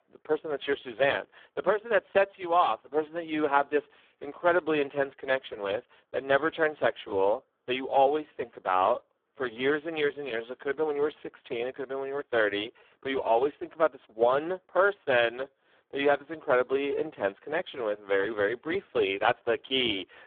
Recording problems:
phone-call audio; poor line; nothing above 3.5 kHz

